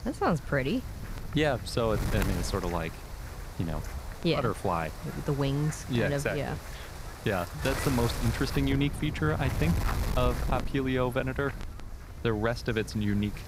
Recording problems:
wind noise on the microphone; heavy; 9 dB below the speech

